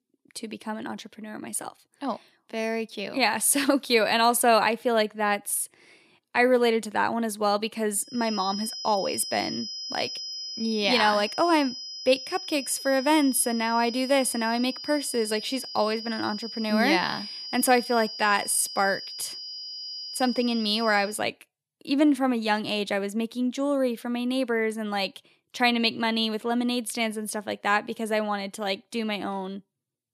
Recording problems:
high-pitched whine; loud; from 8 to 21 s; 5 kHz, 9 dB below the speech

